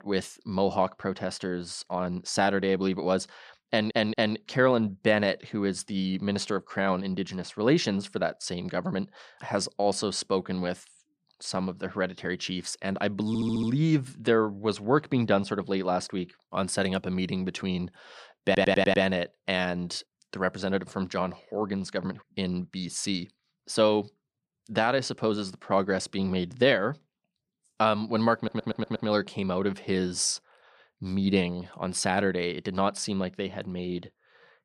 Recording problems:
audio stuttering; 4 times, first at 3.5 s

